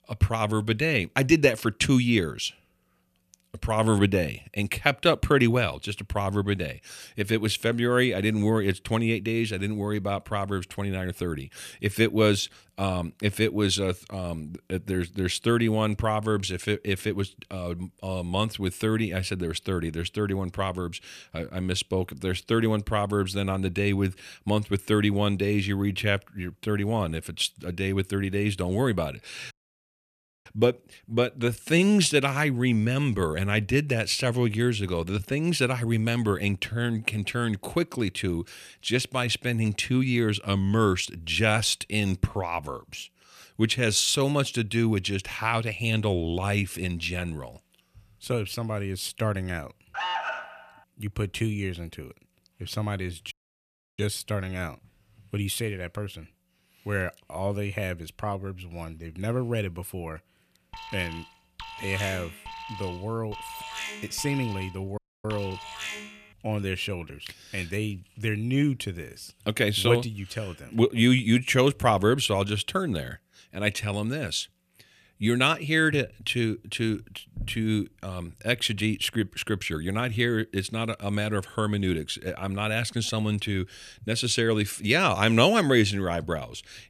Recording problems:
audio cutting out; at 30 s for 1 s, at 53 s for 0.5 s and at 1:05
alarm; noticeable; at 50 s and from 1:01 to 1:06; peak 2 dB below the speech

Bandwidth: 14.5 kHz